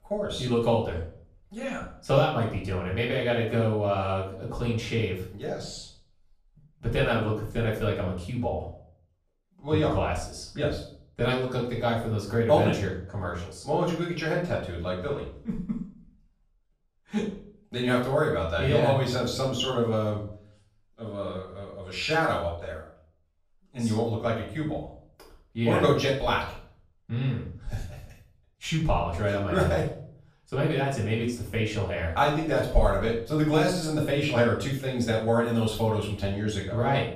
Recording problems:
off-mic speech; far
room echo; noticeable; dies away in 0.4 s

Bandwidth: 14.5 kHz